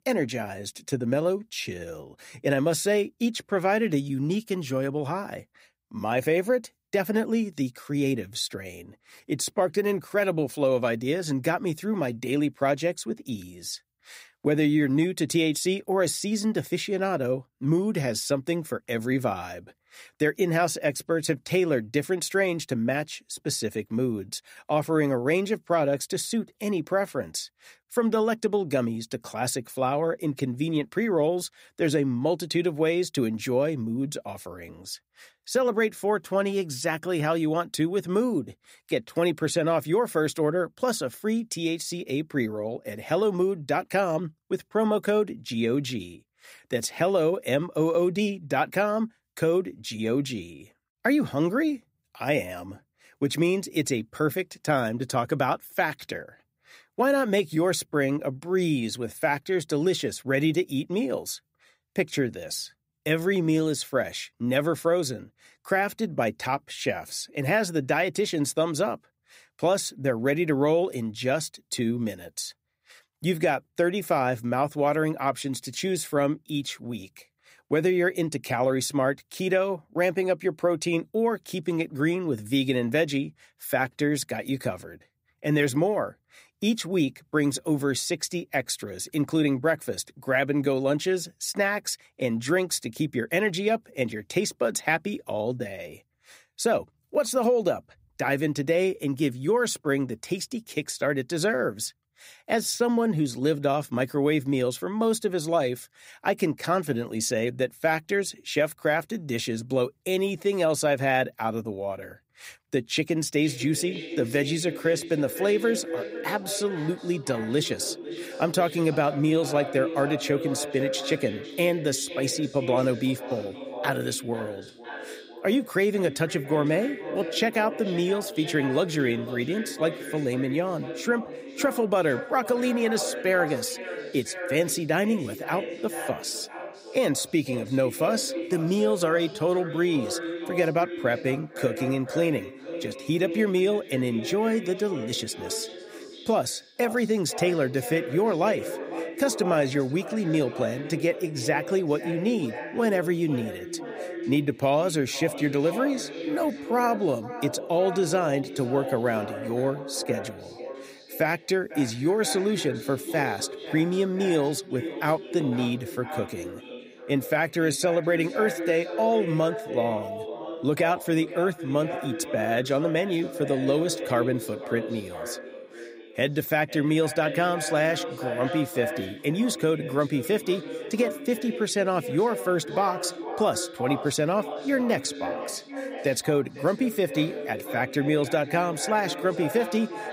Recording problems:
echo of what is said; strong; from 1:53 on; 500 ms later, 9 dB below the speech

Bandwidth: 15.5 kHz